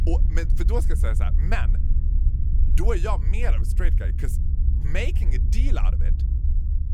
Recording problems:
low rumble; loud; throughout; 10 dB below the speech
traffic noise; faint; throughout; 20 dB below the speech

